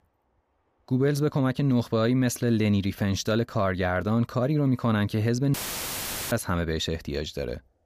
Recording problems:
audio cutting out; filled with static; at 5.5 s for 1 s

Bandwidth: 15 kHz